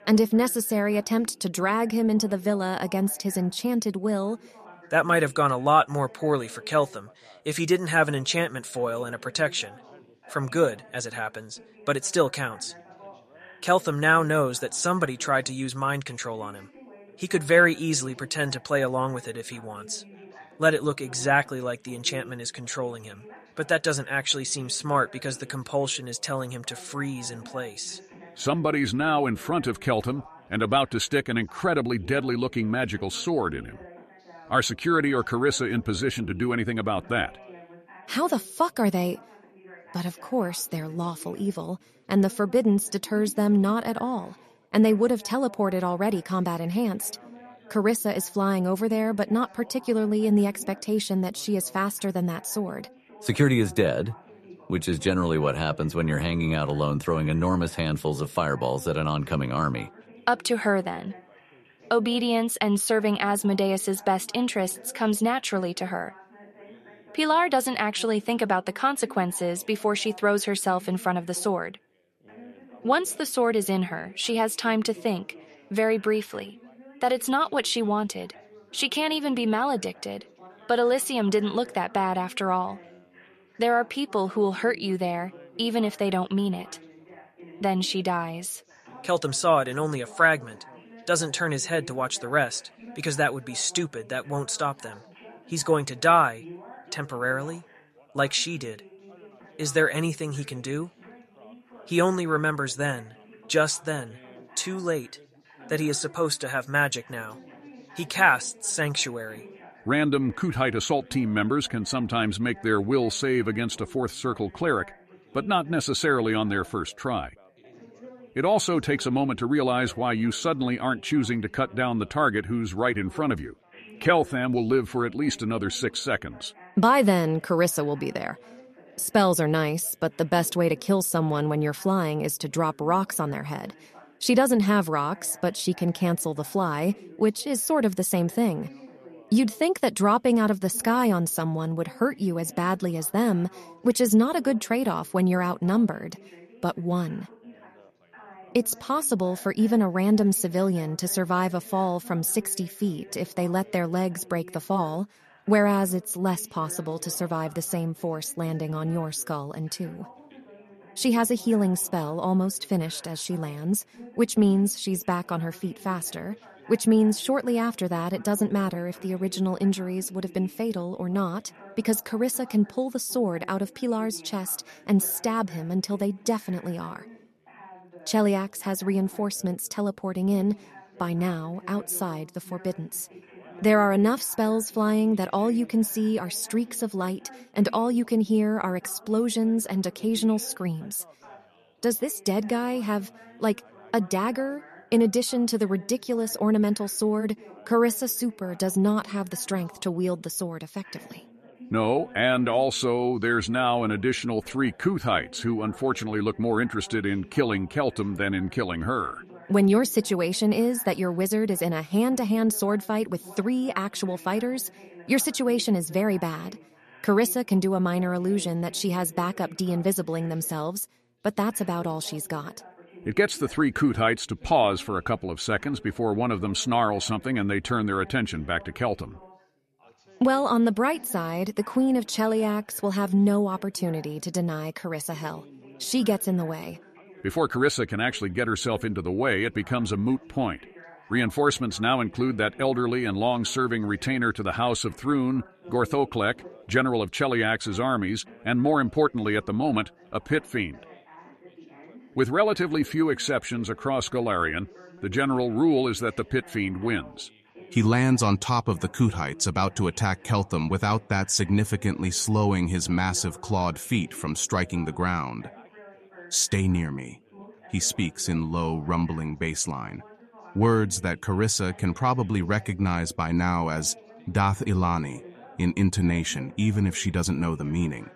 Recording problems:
background chatter; faint; throughout; 4 voices, 25 dB below the speech

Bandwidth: 13.5 kHz